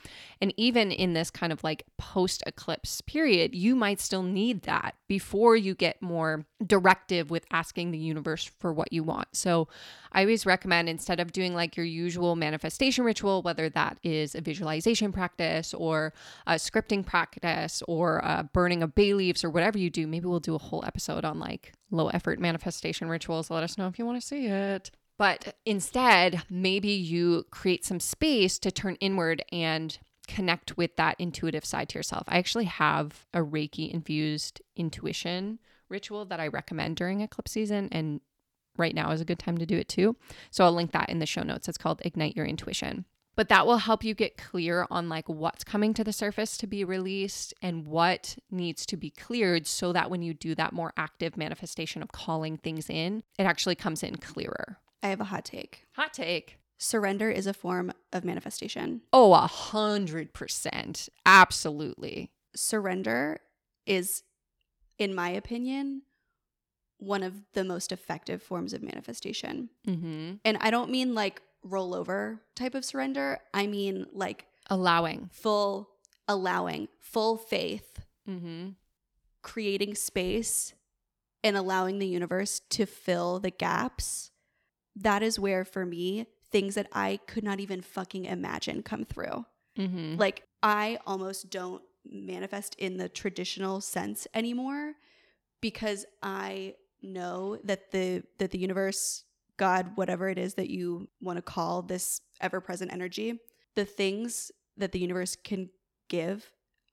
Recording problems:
none

